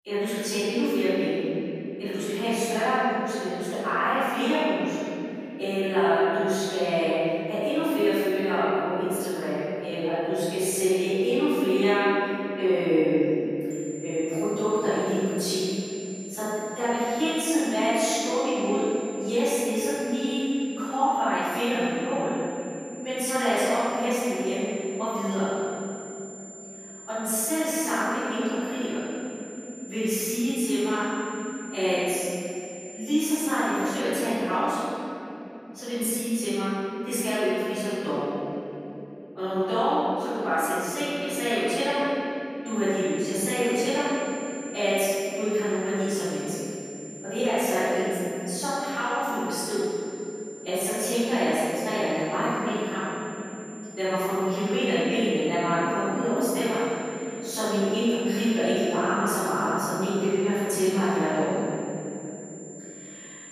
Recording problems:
room echo; strong; dies away in 3 s
off-mic speech; far
high-pitched whine; noticeable; from 14 to 34 s and from 43 s on; 7 kHz, 15 dB below the speech

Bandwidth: 14.5 kHz